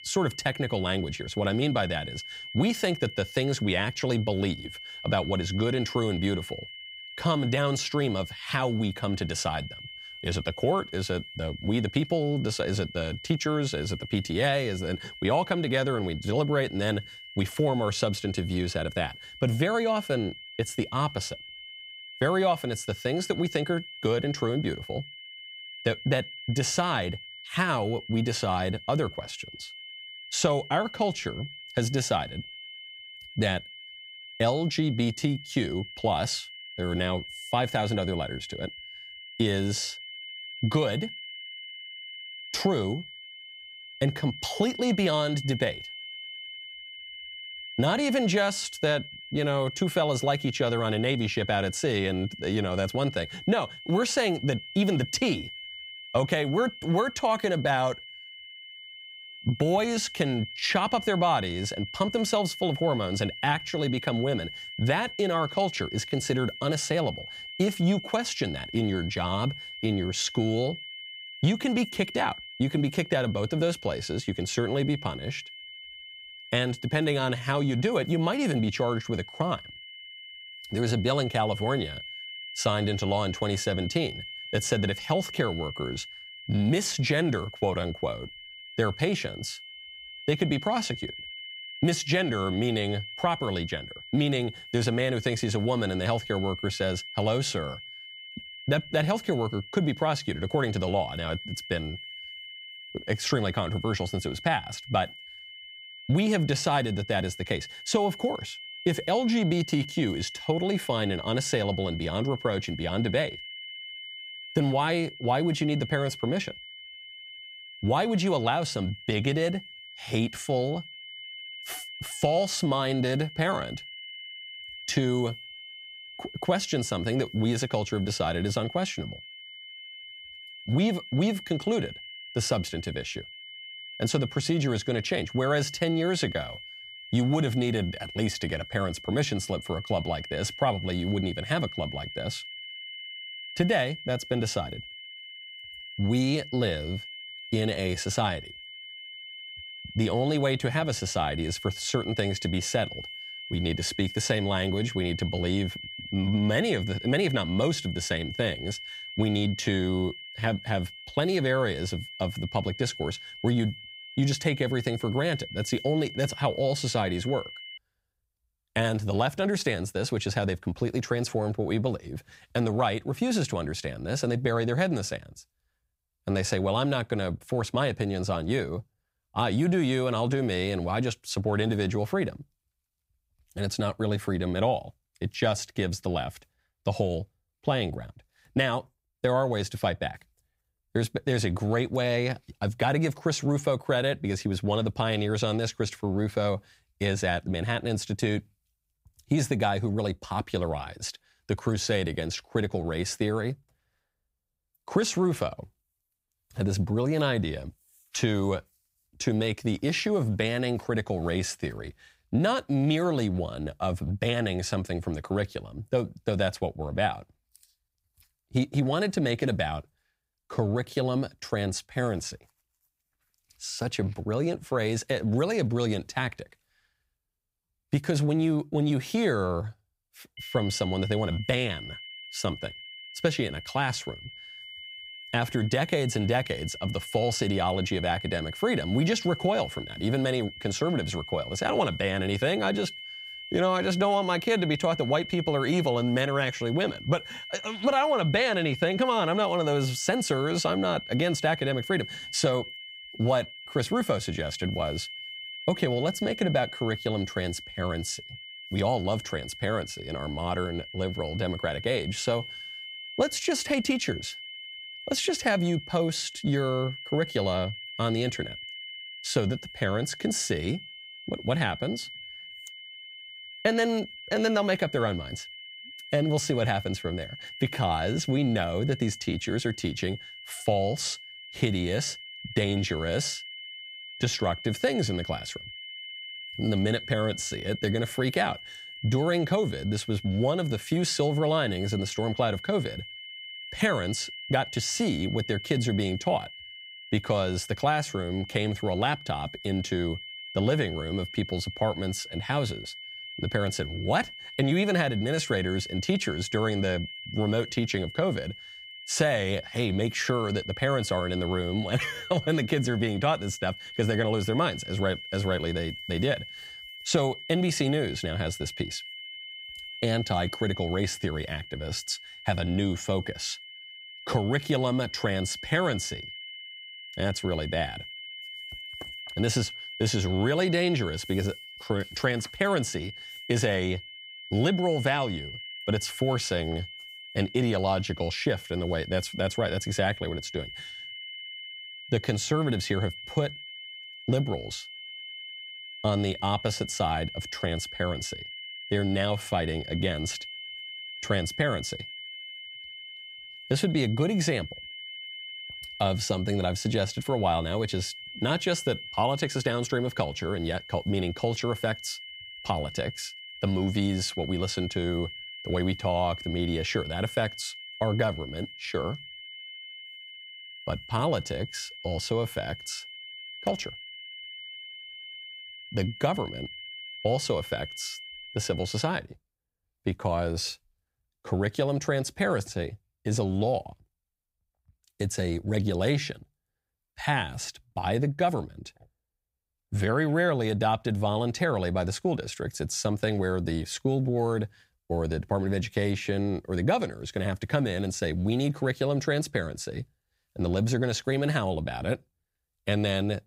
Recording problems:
high-pitched whine; noticeable; until 2:48 and from 3:50 to 6:19; 3 kHz, 10 dB below the speech

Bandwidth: 15.5 kHz